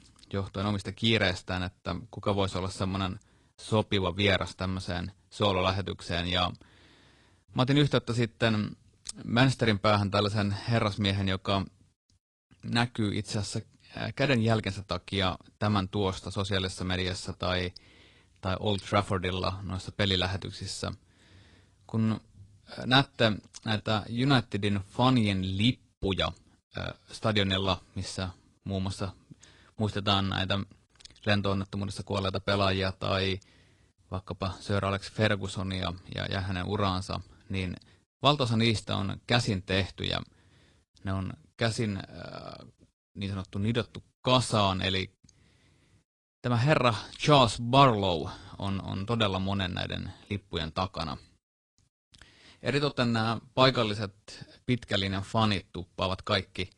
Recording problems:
garbled, watery; slightly

